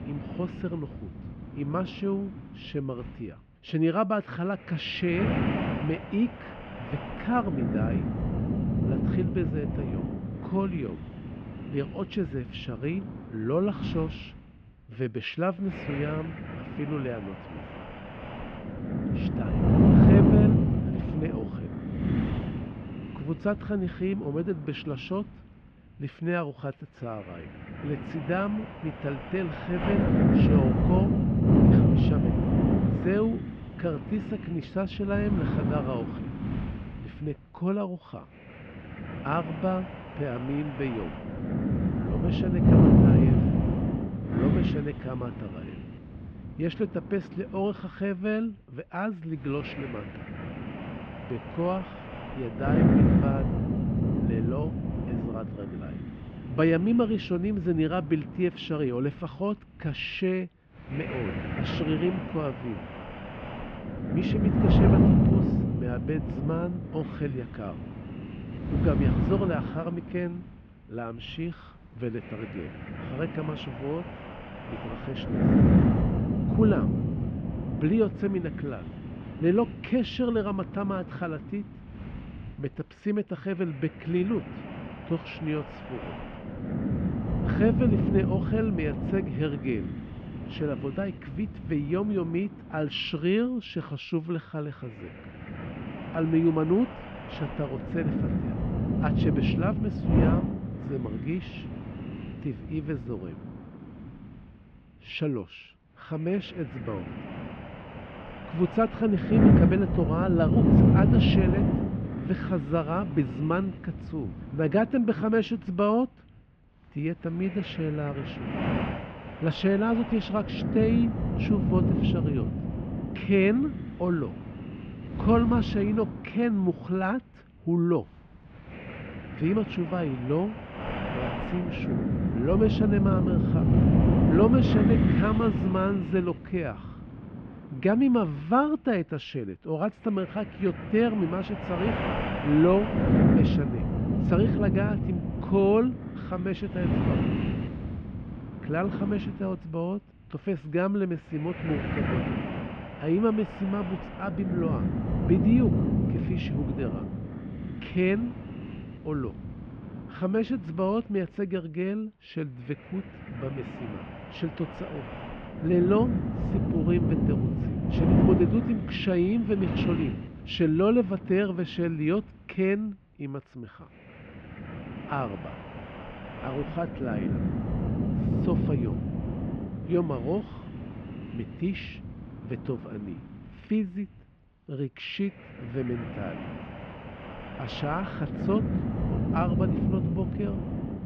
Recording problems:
muffled; very; fading above 2.5 kHz
wind noise on the microphone; heavy; 2 dB below the speech

